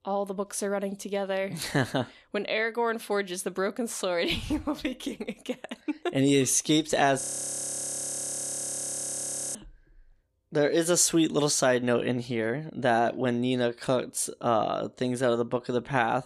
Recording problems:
audio freezing; at 7 s for 2.5 s

